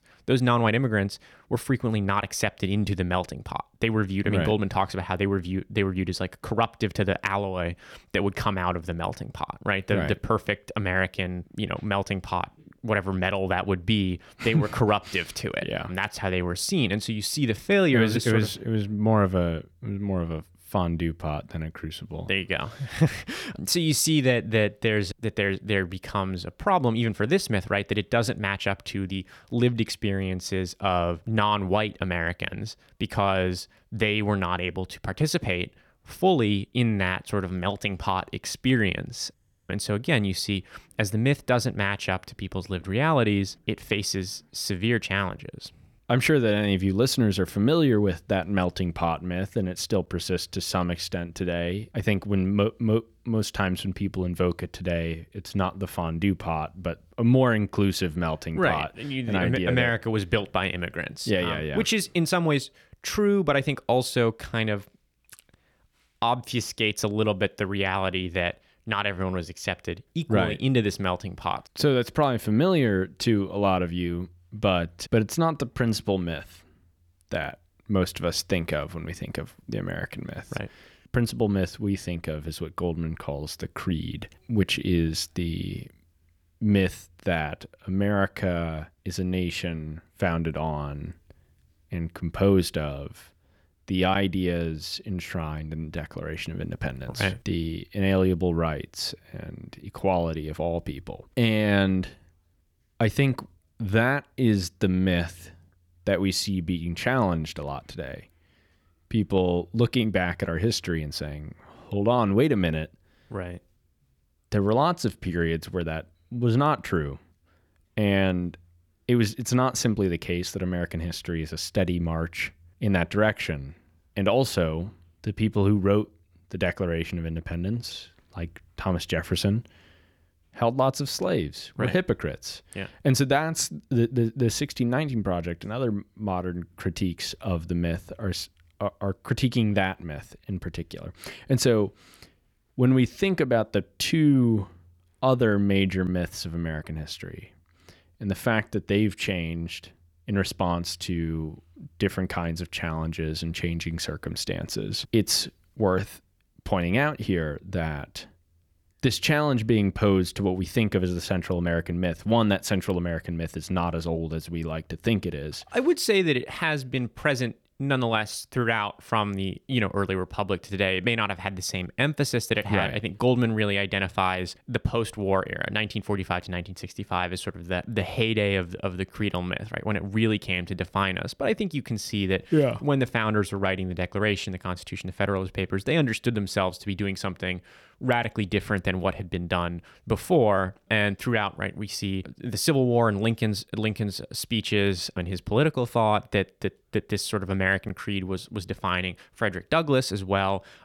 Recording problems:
none

